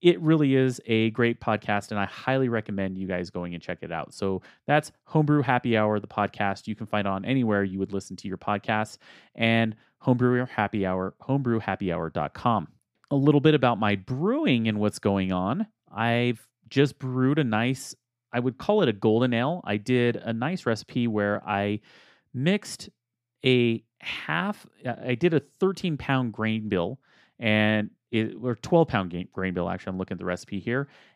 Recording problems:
none

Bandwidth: 15 kHz